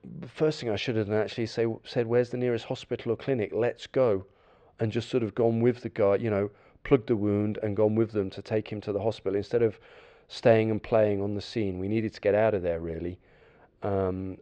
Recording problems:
muffled; slightly; fading above 3.5 kHz

